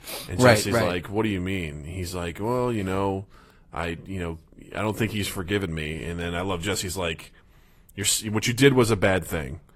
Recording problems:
garbled, watery; slightly; nothing above 14.5 kHz

